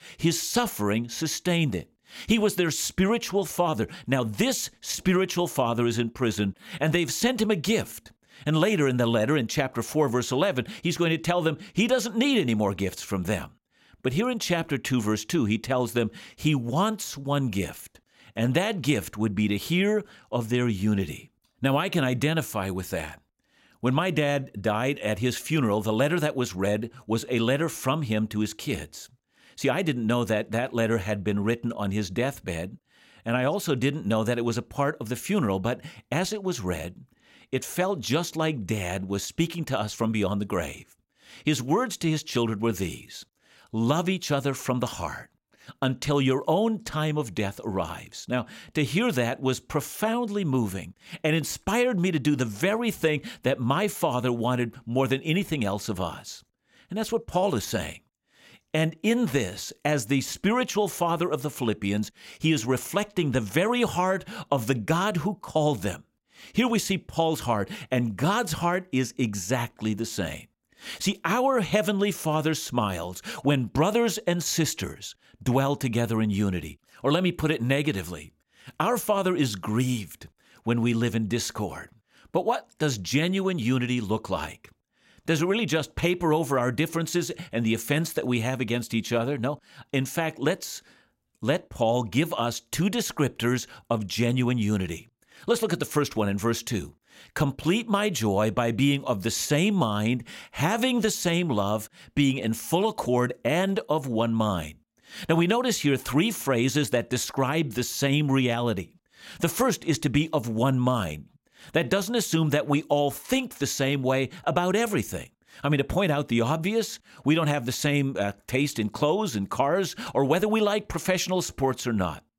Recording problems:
none

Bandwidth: 16 kHz